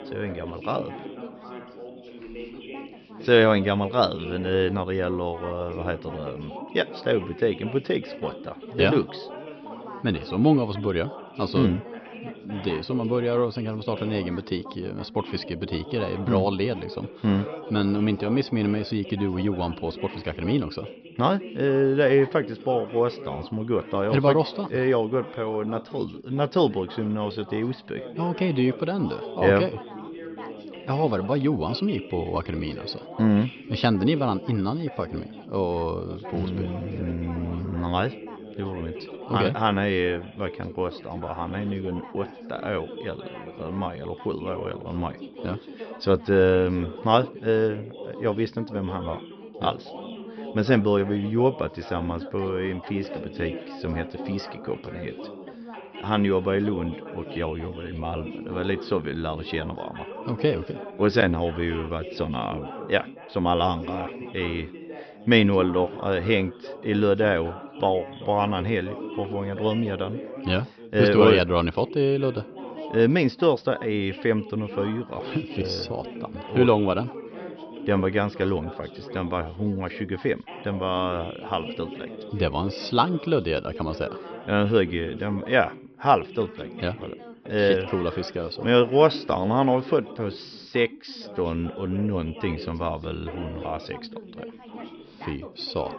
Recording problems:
high frequencies cut off; noticeable; nothing above 5.5 kHz
background chatter; noticeable; throughout; 3 voices, 15 dB below the speech

